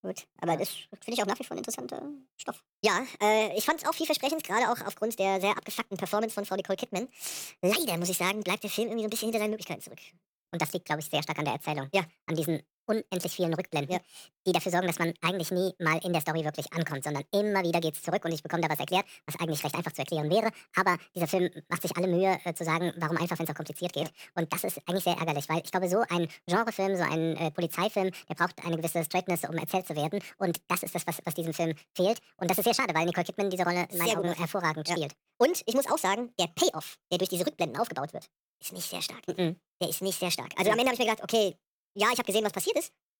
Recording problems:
wrong speed and pitch; too fast and too high; 1.6 times normal speed

